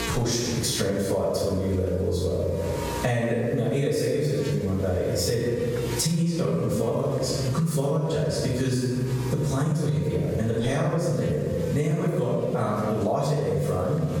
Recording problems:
room echo; strong; dies away in 1.2 s
off-mic speech; far
squashed, flat; somewhat
electrical hum; noticeable; throughout; 60 Hz, 15 dB below the speech

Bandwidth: 18 kHz